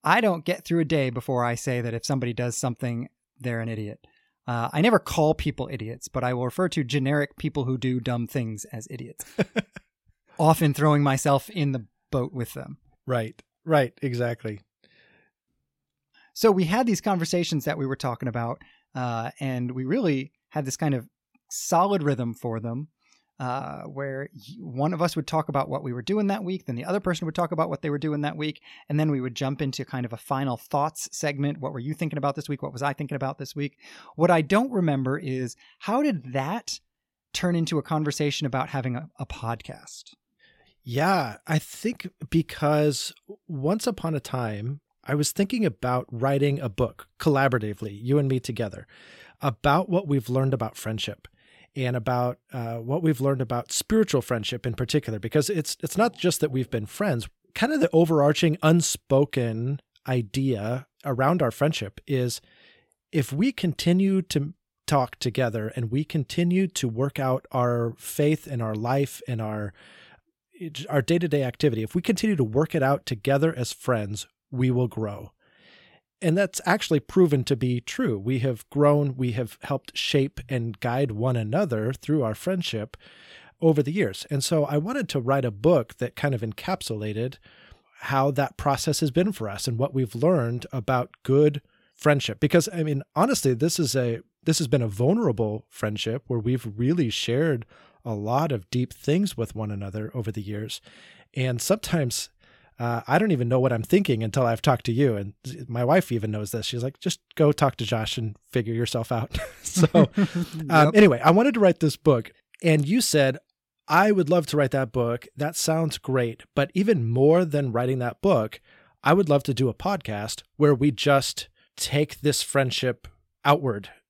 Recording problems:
none

